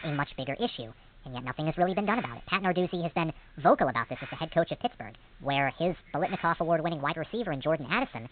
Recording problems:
high frequencies cut off; severe; nothing above 4 kHz
wrong speed and pitch; too fast and too high; 1.6 times normal speed
hiss; faint; throughout; 20 dB below the speech

